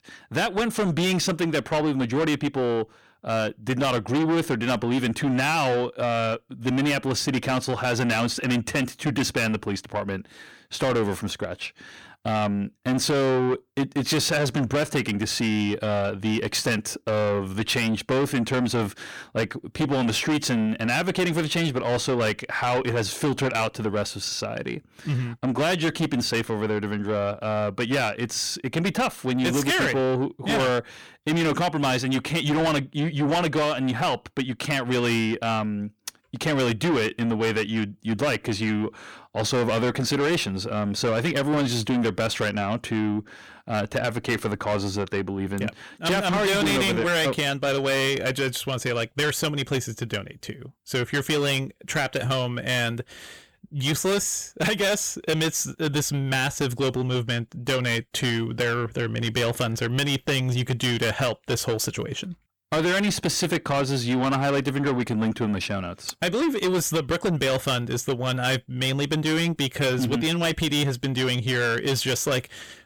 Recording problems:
distortion; heavy; 7 dB below the speech

